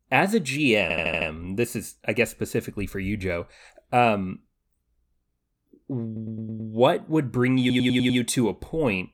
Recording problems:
audio stuttering; at 1 s, at 6 s and at 7.5 s

